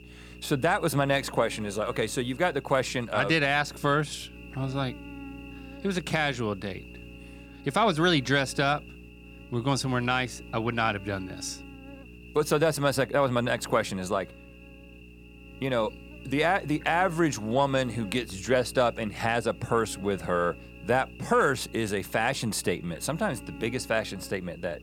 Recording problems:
electrical hum; faint; throughout; 60 Hz, 20 dB below the speech

